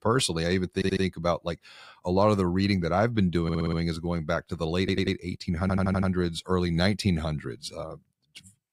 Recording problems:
audio stuttering; 4 times, first at 1 s

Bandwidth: 15.5 kHz